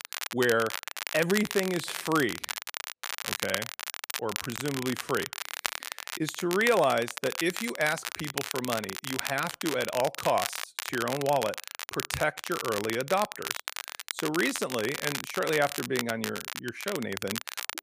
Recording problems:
crackle, like an old record; loud; 5 dB below the speech

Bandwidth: 15 kHz